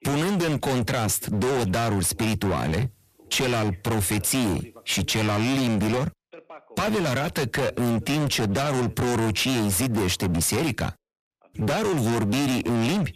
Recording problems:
distortion; heavy; 37% of the sound clipped
voice in the background; faint; throughout; 25 dB below the speech

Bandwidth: 14.5 kHz